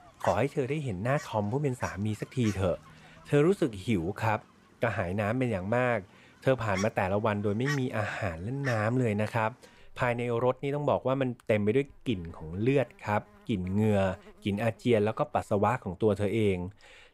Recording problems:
animal sounds; noticeable; throughout; 15 dB below the speech

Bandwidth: 15.5 kHz